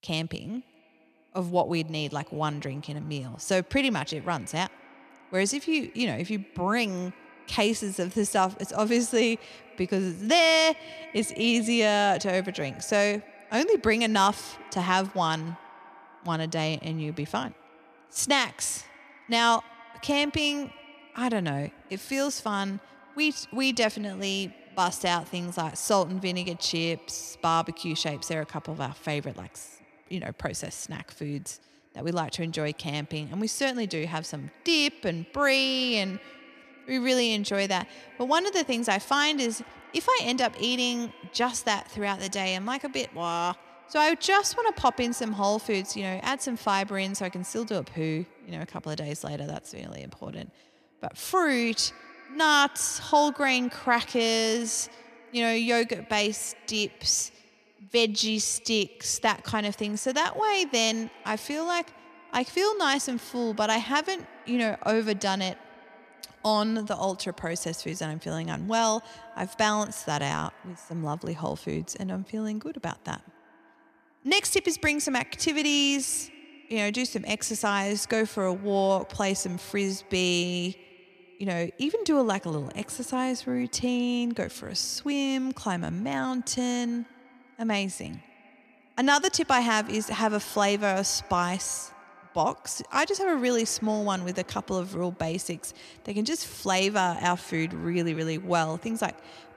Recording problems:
echo of what is said; faint; throughout; 90 ms later, 20 dB below the speech

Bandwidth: 14.5 kHz